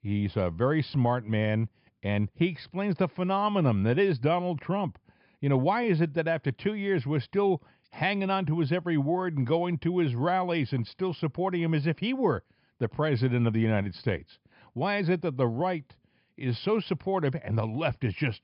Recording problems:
high frequencies cut off; noticeable; nothing above 5.5 kHz

